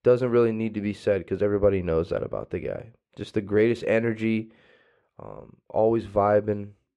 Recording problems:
muffled; slightly; fading above 3.5 kHz

